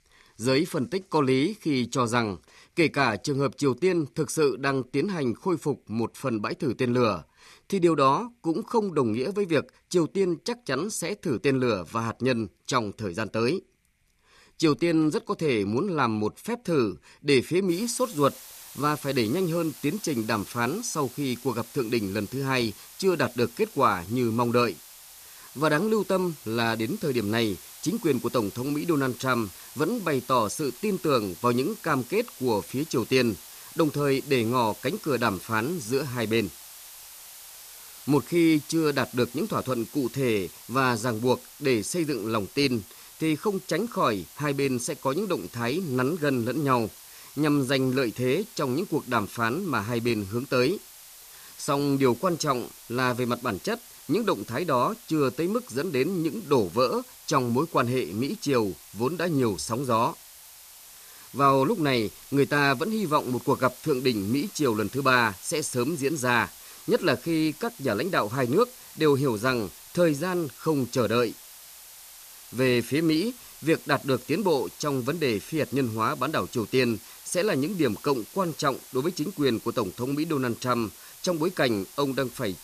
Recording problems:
hiss; noticeable; from 18 s on; 15 dB below the speech

